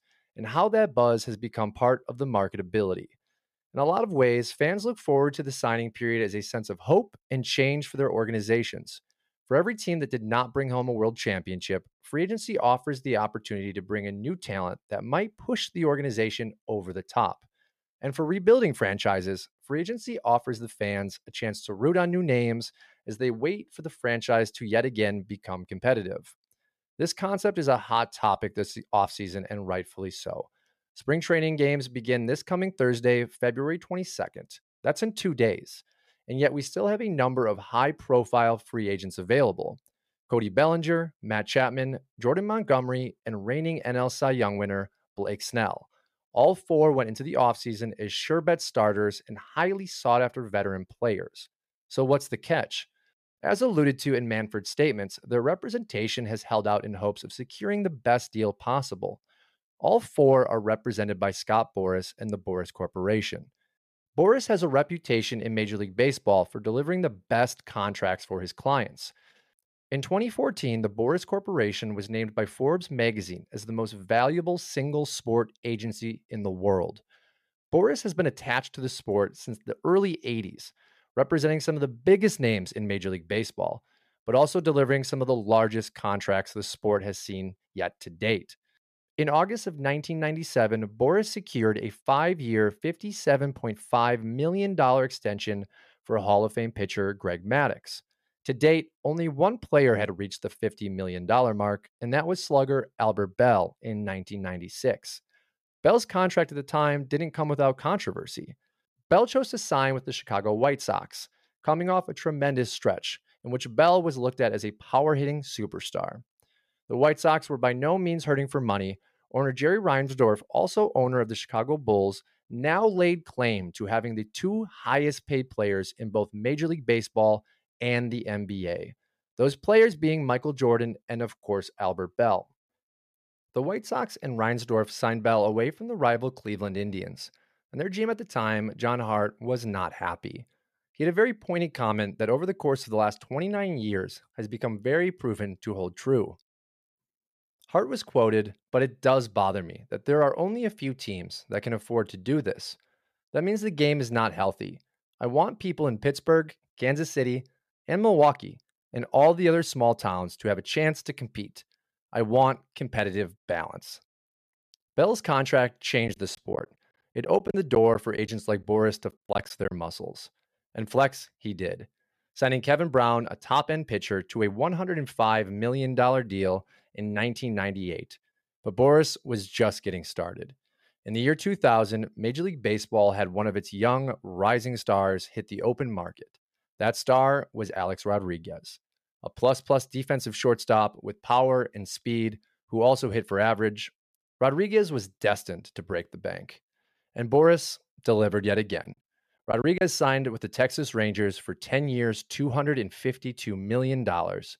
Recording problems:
choppy; very; from 2:46 to 2:50 and at 3:19; 11% of the speech affected

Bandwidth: 14.5 kHz